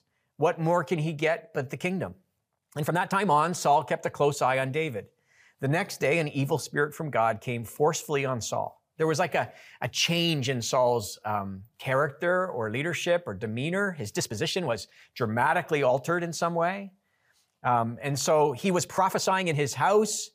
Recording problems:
uneven, jittery; strongly; from 1.5 to 20 s

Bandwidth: 15 kHz